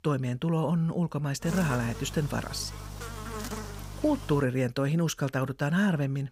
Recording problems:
electrical hum; loud; from 1.5 to 4.5 s; 50 Hz, 10 dB below the speech

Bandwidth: 15.5 kHz